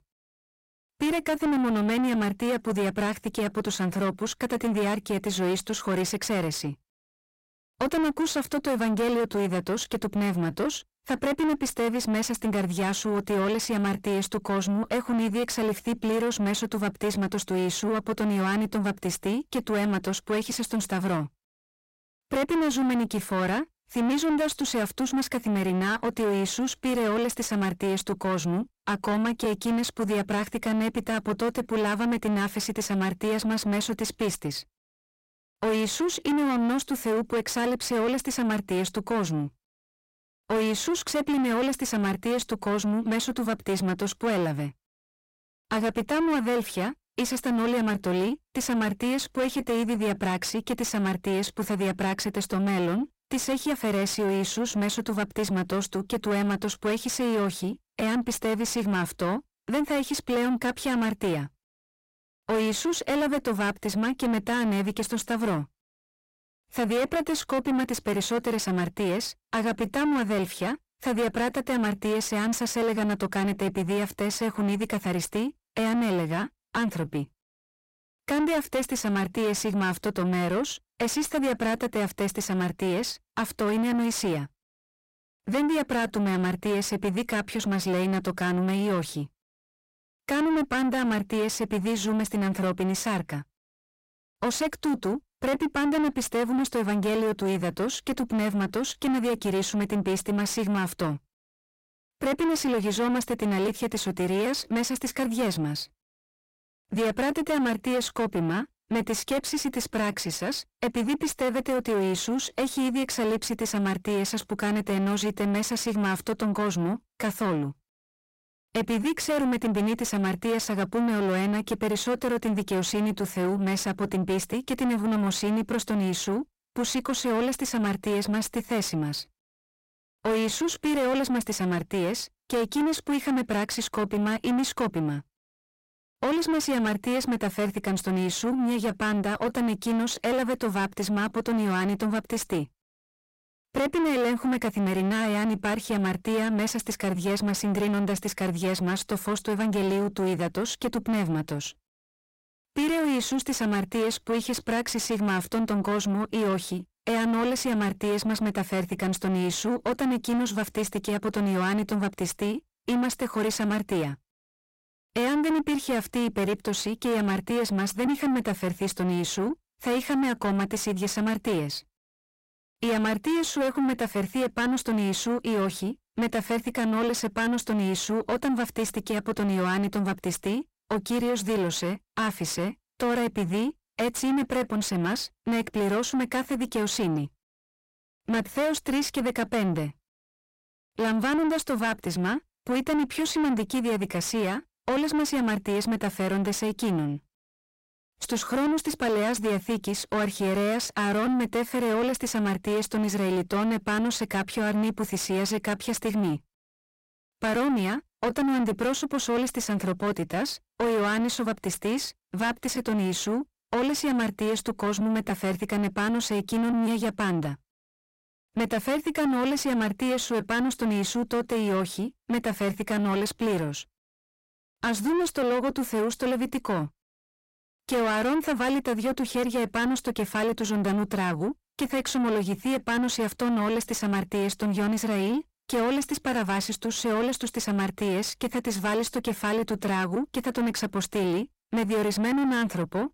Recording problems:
distortion; heavy; 7 dB below the speech

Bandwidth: 16 kHz